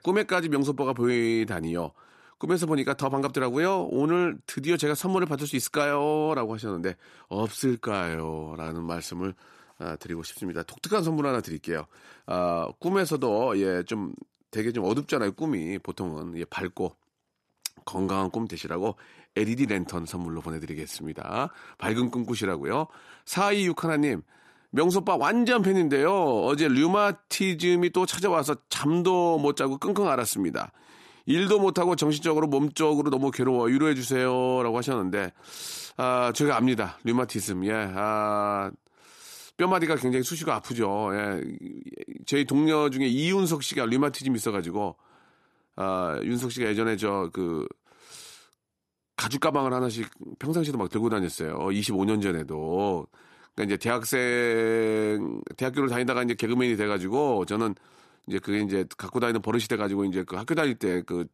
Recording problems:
none

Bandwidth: 13.5 kHz